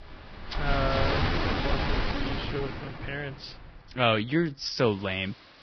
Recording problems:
garbled, watery; badly; nothing above 5.5 kHz
rain or running water; loud; throughout; as loud as the speech
uneven, jittery; strongly; from 1 to 5 s

